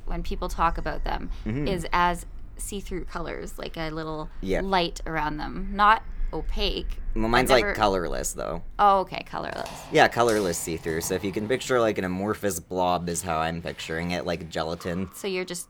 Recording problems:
animal sounds; noticeable; throughout; 15 dB below the speech

